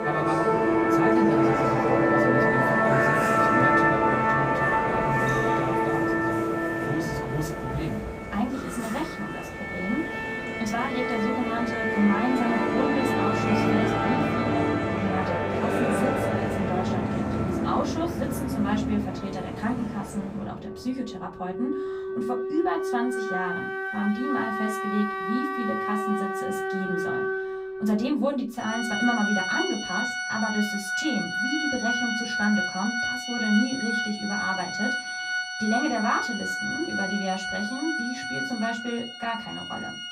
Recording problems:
off-mic speech; far
room echo; very slight; dies away in 0.2 s
background music; very loud; throughout; 4 dB above the speech

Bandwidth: 15.5 kHz